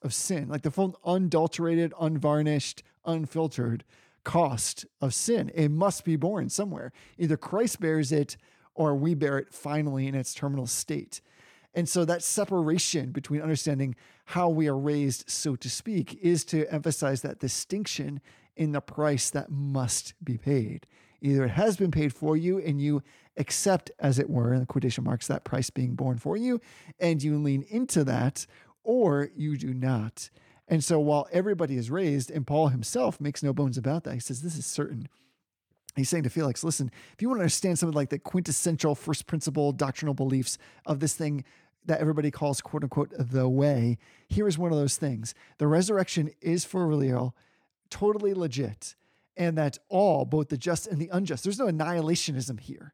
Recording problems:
none

